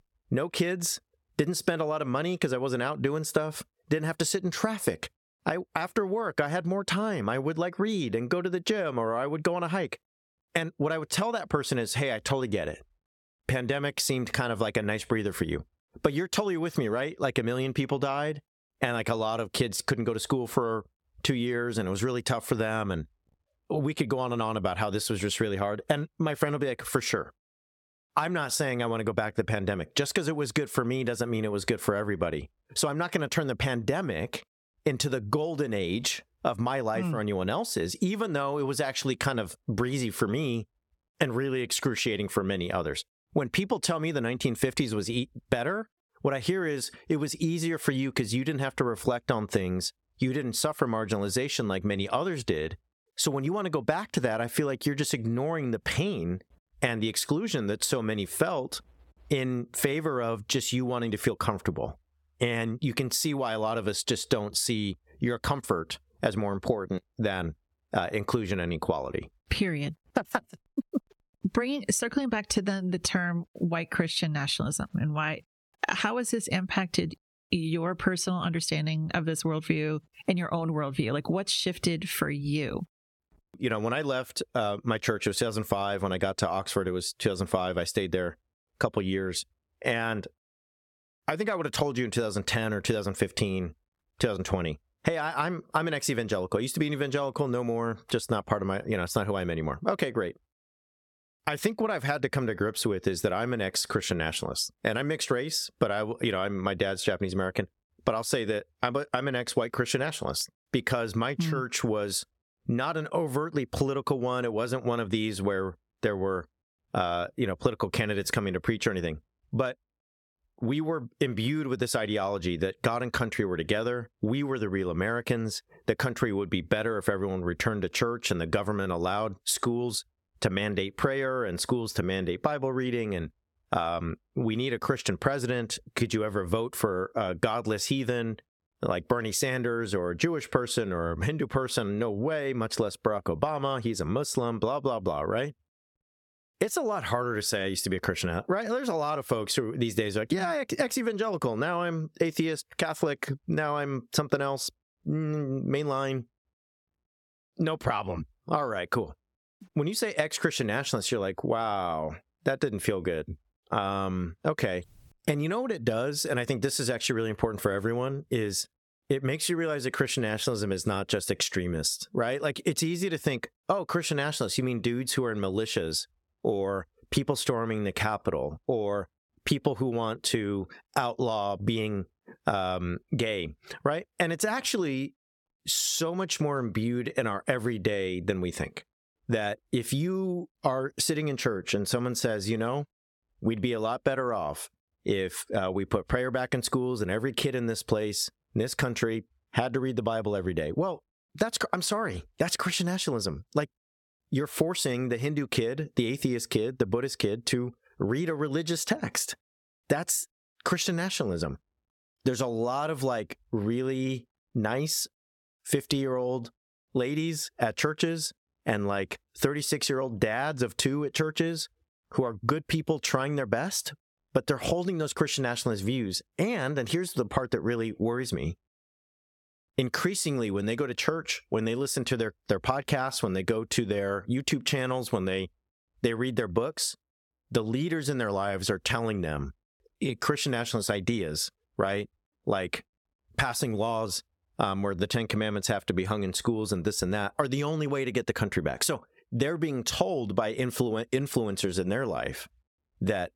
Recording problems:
squashed, flat; somewhat

